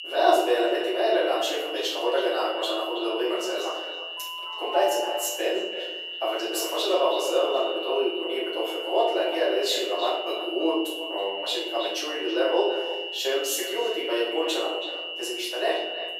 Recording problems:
echo of what is said; strong; throughout; 330 ms later, 10 dB below the speech
off-mic speech; far
thin; very; fading below 350 Hz
room echo; noticeable; dies away in 0.9 s
high-pitched whine; loud; throughout; 3 kHz, 6 dB below the speech
doorbell; noticeable; from 4 to 5.5 s; peak 6 dB below the speech

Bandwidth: 15 kHz